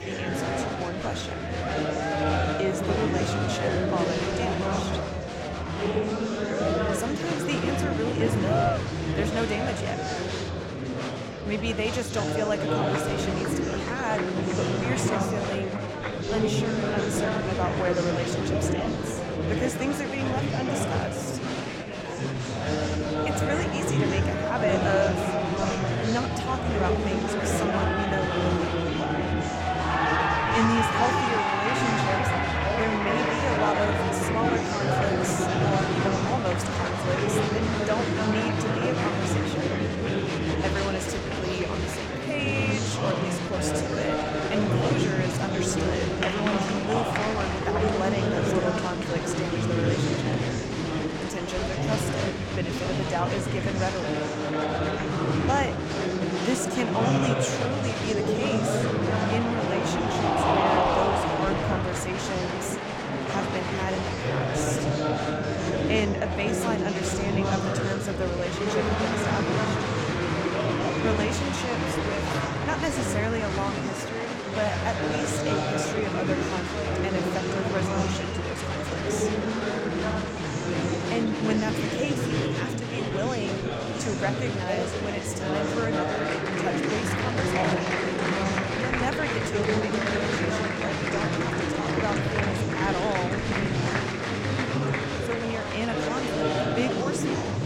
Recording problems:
murmuring crowd; very loud; throughout; 5 dB above the speech

